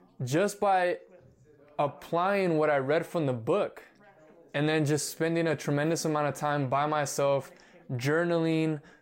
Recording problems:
background chatter; faint; throughout; 3 voices, 30 dB below the speech

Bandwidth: 16 kHz